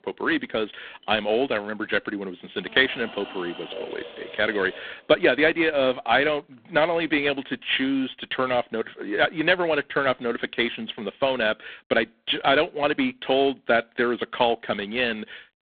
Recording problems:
phone-call audio; poor line
household noises; noticeable; until 7.5 s; 15 dB below the speech

